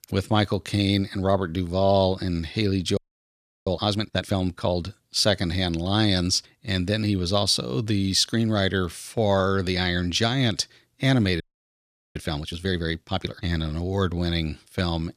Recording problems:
audio freezing; at 3 s for 0.5 s and at 11 s for 1 s

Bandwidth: 14.5 kHz